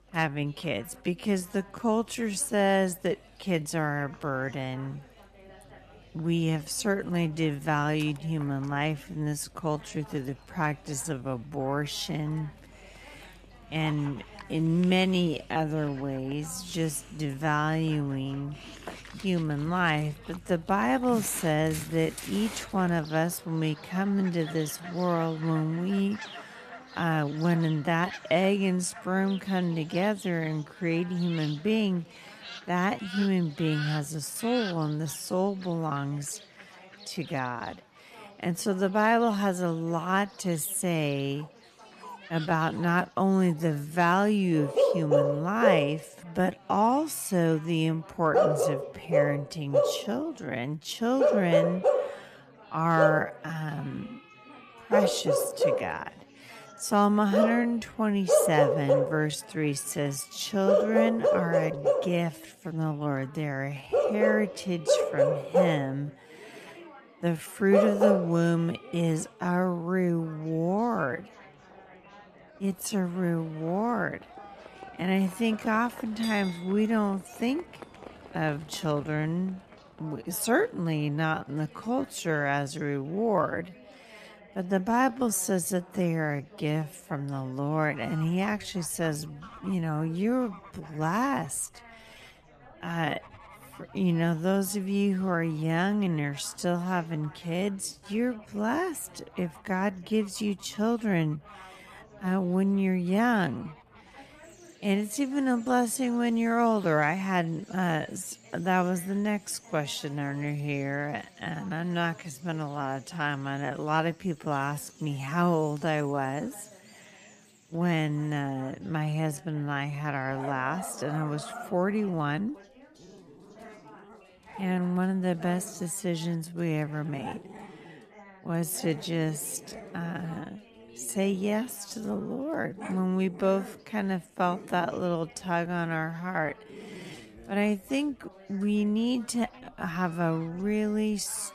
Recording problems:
wrong speed, natural pitch; too slow; 0.5 times normal speed
animal sounds; loud; throughout; 2 dB below the speech
chatter from many people; faint; throughout; 25 dB below the speech

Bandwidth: 14 kHz